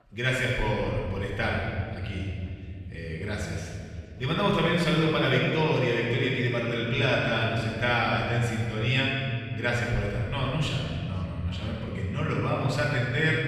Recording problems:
room echo; strong; dies away in 2.5 s
off-mic speech; far
voice in the background; faint; throughout; 30 dB below the speech

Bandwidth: 15 kHz